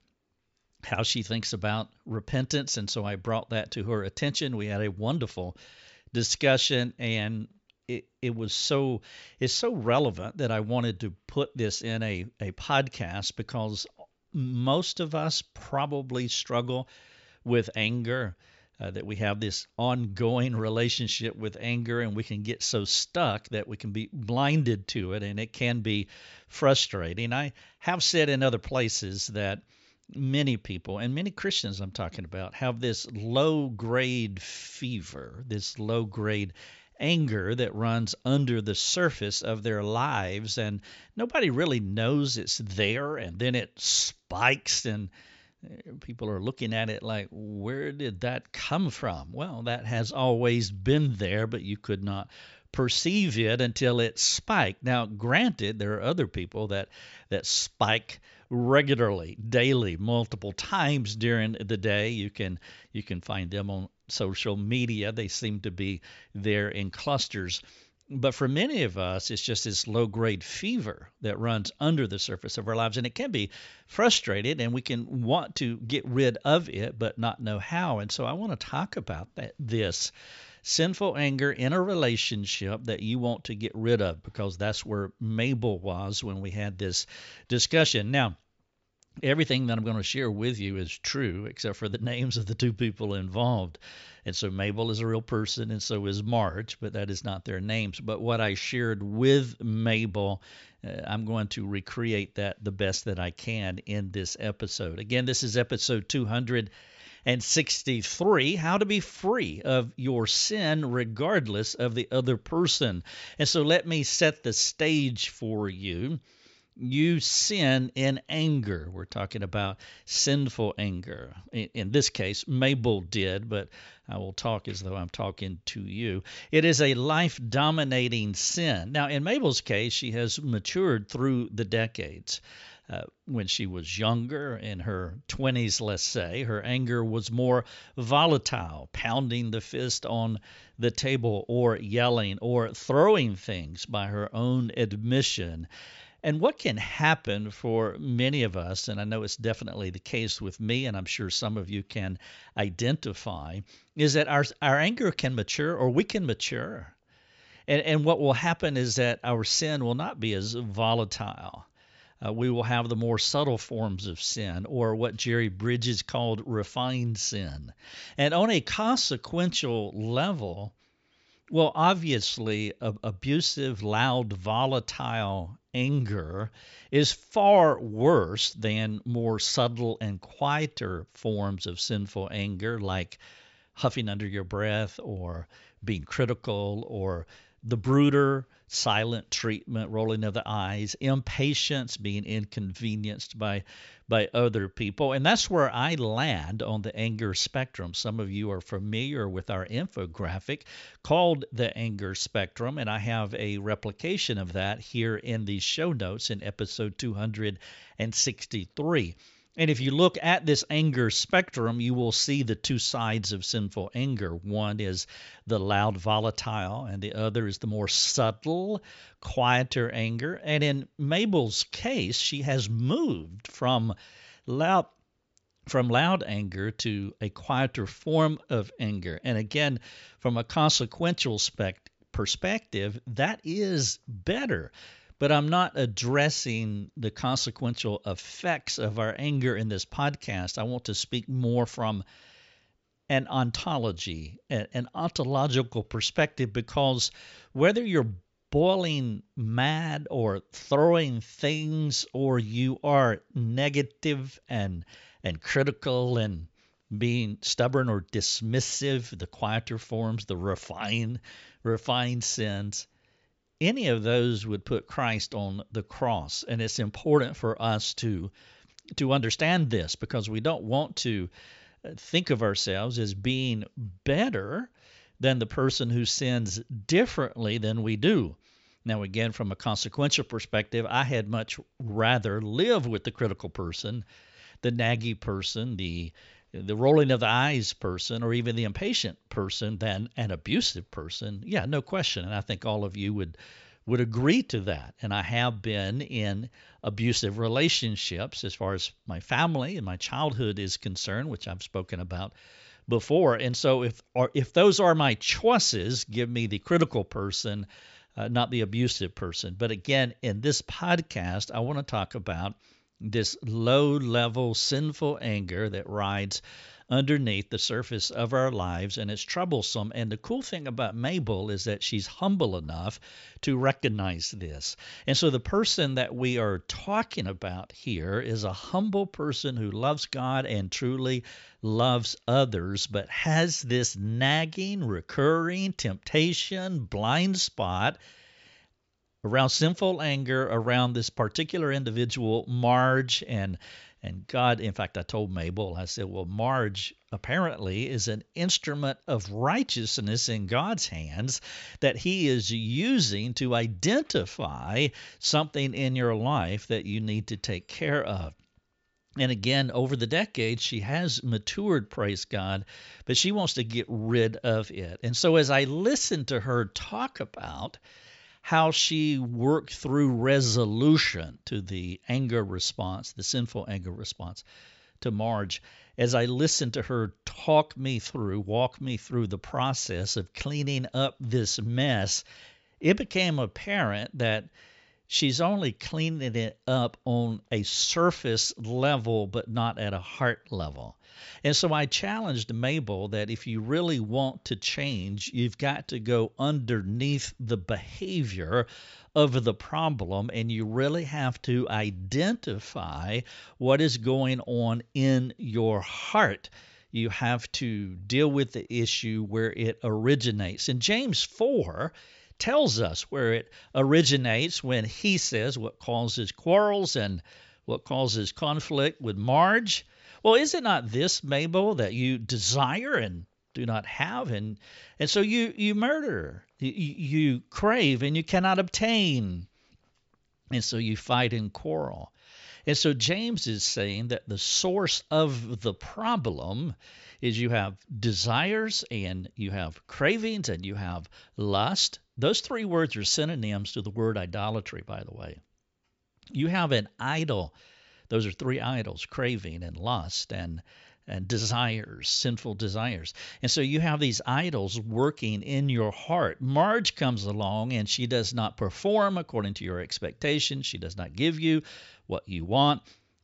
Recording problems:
high frequencies cut off; noticeable; nothing above 8 kHz

